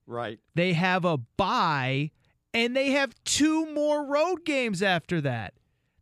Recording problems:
none

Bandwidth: 15 kHz